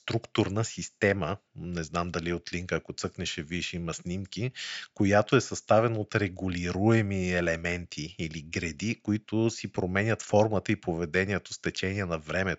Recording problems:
high frequencies cut off; noticeable; nothing above 8 kHz

